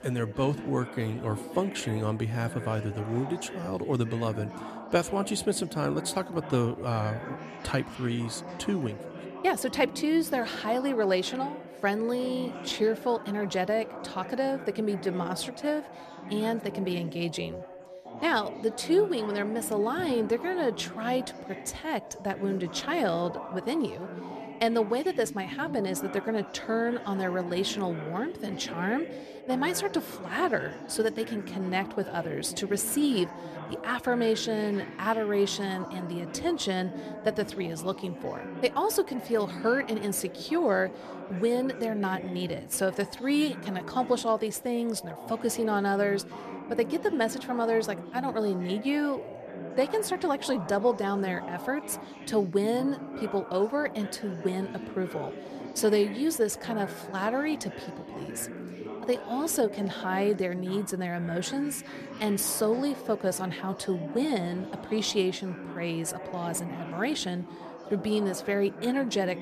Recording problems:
background chatter; noticeable; throughout; 3 voices, 10 dB below the speech

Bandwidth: 14 kHz